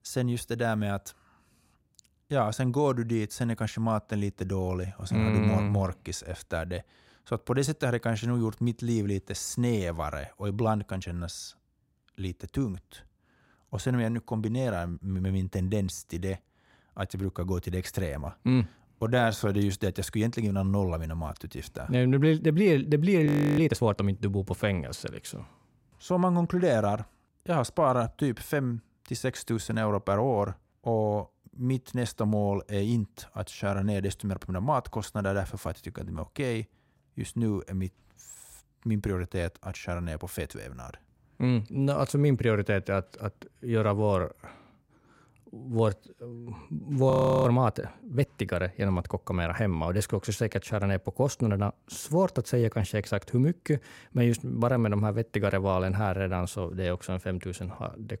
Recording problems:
audio freezing; at 23 s and at 47 s

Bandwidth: 16 kHz